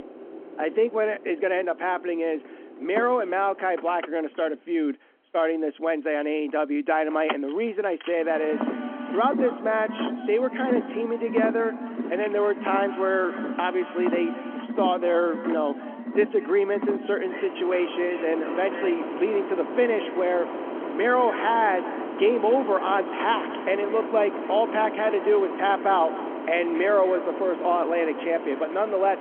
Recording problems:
echo of what is said; noticeable; from 8.5 s on; 220 ms later, 15 dB below the speech
phone-call audio
traffic noise; loud; throughout; 8 dB below the speech

